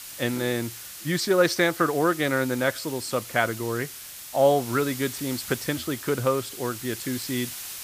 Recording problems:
hiss; noticeable; throughout; 10 dB below the speech

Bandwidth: 15 kHz